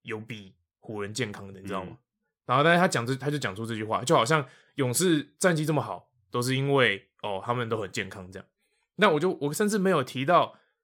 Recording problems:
none

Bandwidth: 17 kHz